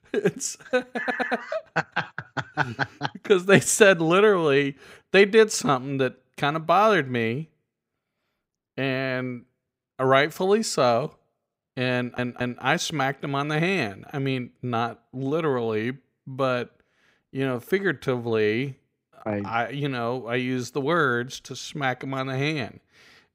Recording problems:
audio stuttering; at 1 s and at 12 s

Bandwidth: 15.5 kHz